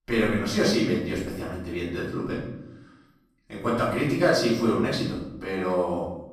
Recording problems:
off-mic speech; far
room echo; noticeable; dies away in 0.8 s

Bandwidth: 15 kHz